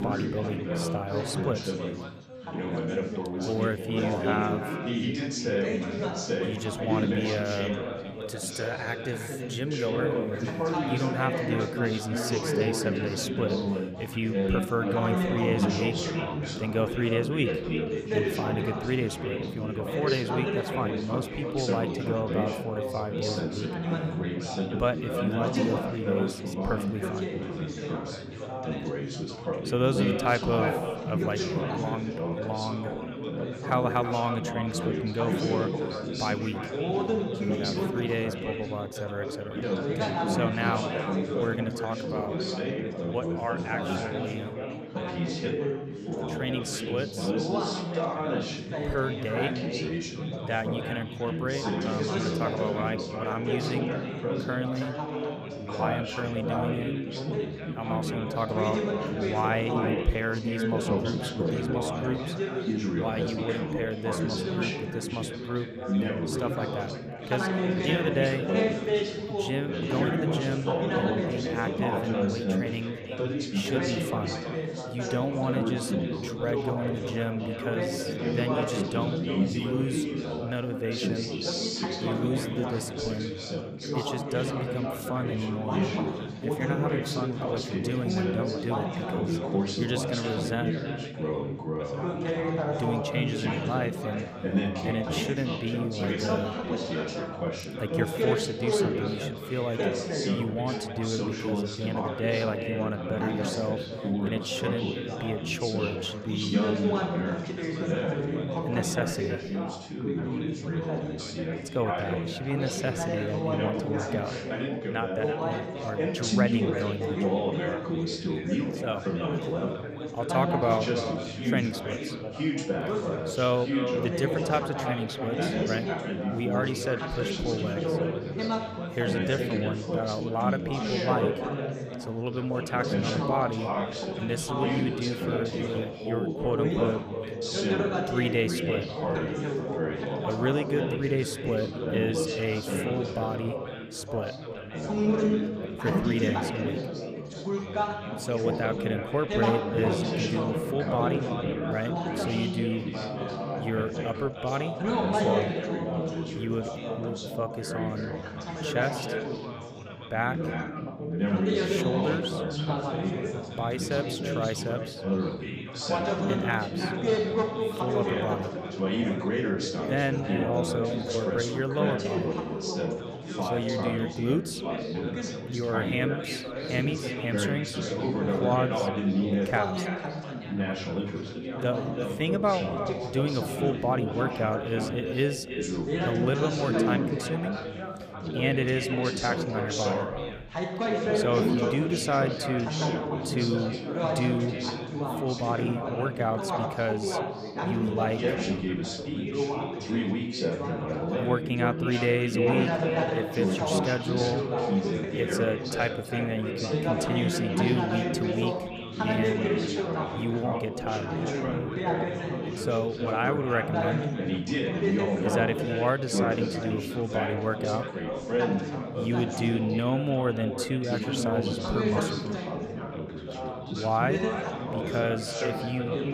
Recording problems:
echo of what is said; strong; throughout; 320 ms later, 8 dB below the speech
chatter from many people; very loud; throughout; 1 dB above the speech

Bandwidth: 15 kHz